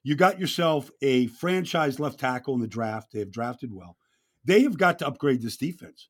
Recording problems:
none

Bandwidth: 17.5 kHz